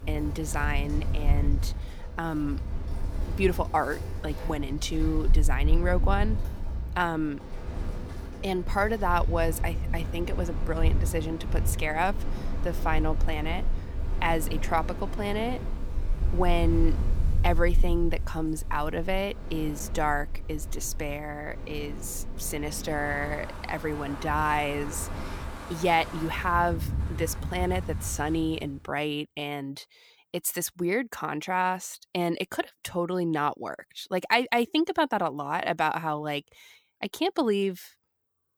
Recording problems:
wind in the background; loud; until 28 s; 3 dB below the speech

